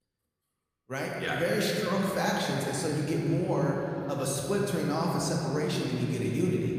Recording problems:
room echo; noticeable; dies away in 3 s
off-mic speech; somewhat distant

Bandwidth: 15 kHz